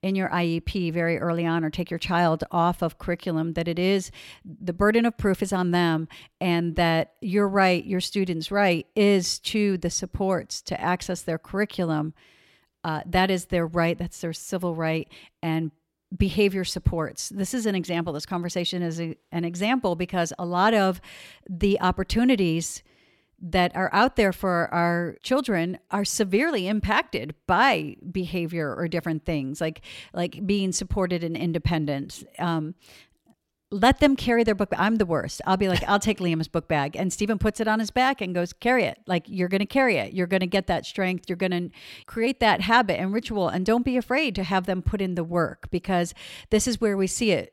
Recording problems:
none

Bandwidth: 16.5 kHz